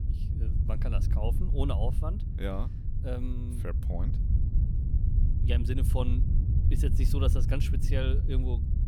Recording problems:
wind noise on the microphone; heavy; 6 dB below the speech

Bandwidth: 18.5 kHz